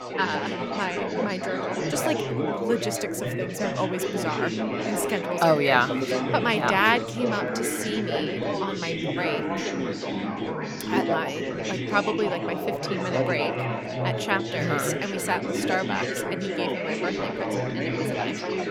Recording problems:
chatter from many people; loud; throughout; 1 dB below the speech

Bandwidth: 17 kHz